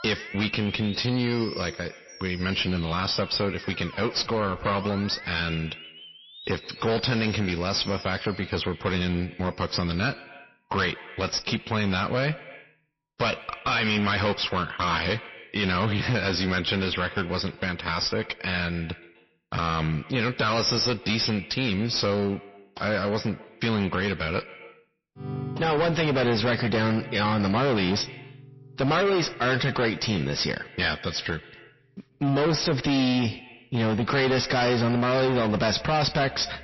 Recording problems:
distortion; heavy; 19% of the sound clipped
echo of what is said; noticeable; throughout; 130 ms later, 20 dB below the speech
garbled, watery; slightly; nothing above 5.5 kHz
background music; noticeable; throughout; 15 dB below the speech

